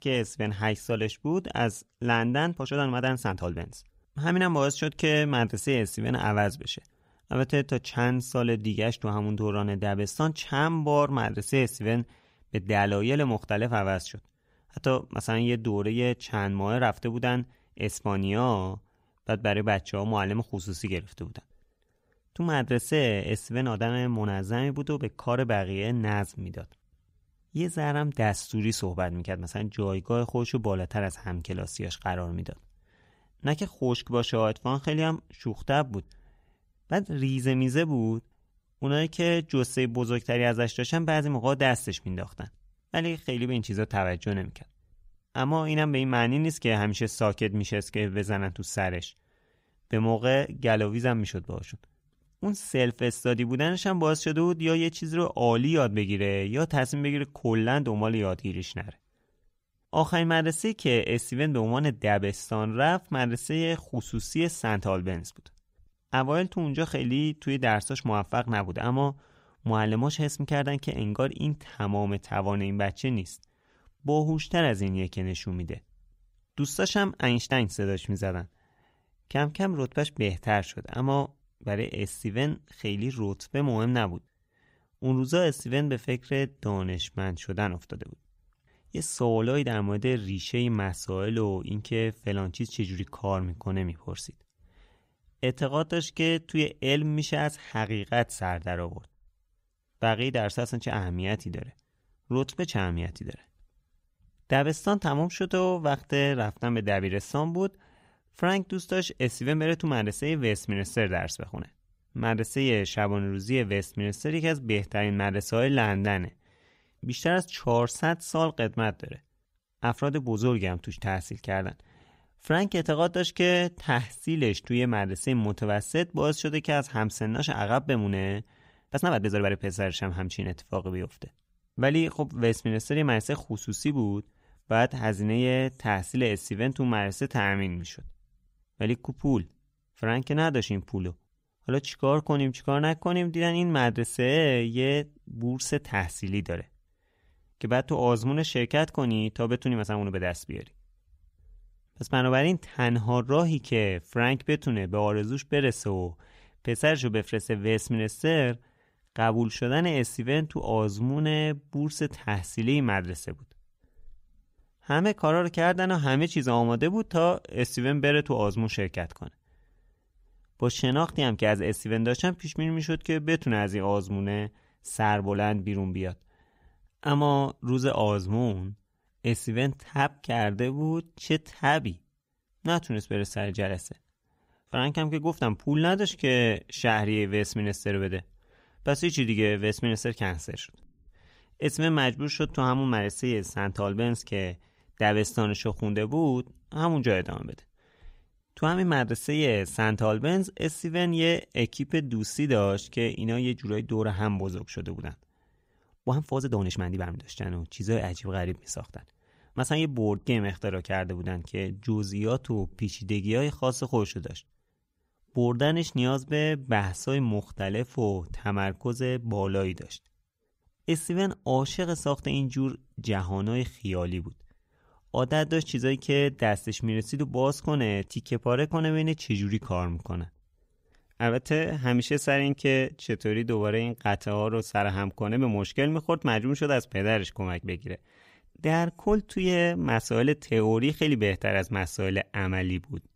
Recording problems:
uneven, jittery; strongly; from 2.5 s to 3:27

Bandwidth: 15.5 kHz